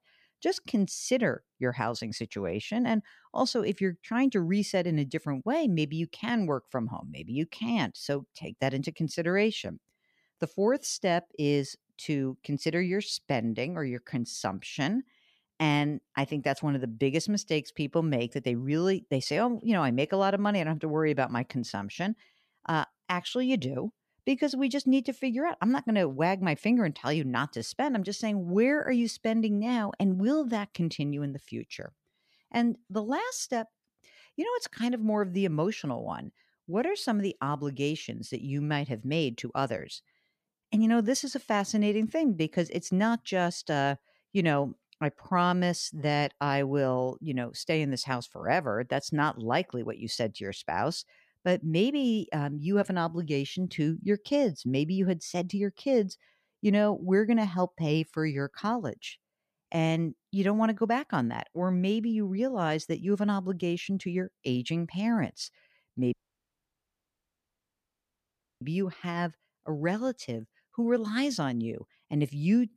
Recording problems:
audio cutting out; at 1:06 for 2.5 s

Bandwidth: 14.5 kHz